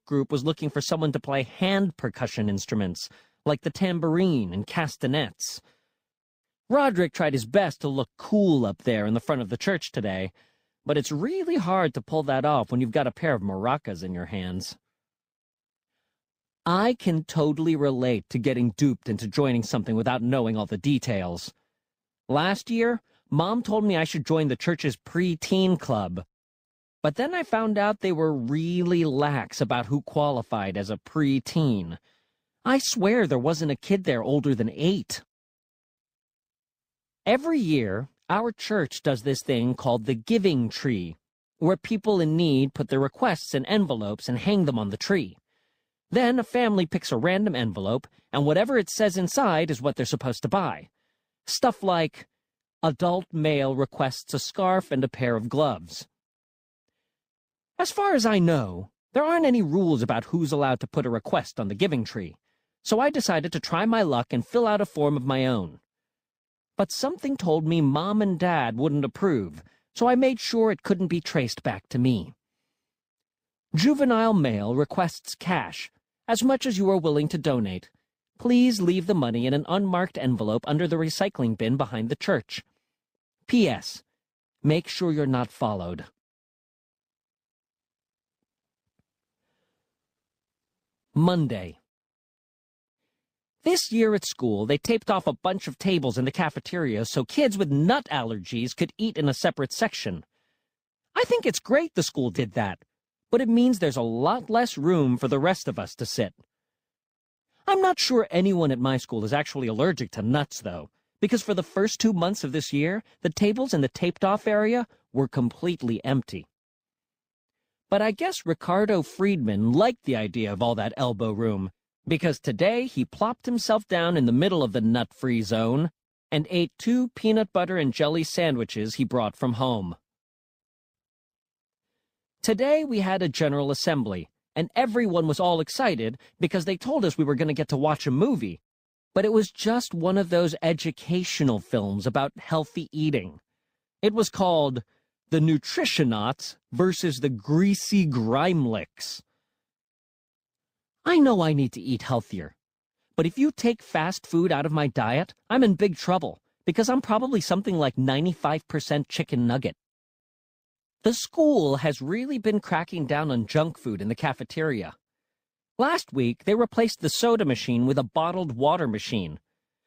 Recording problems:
none

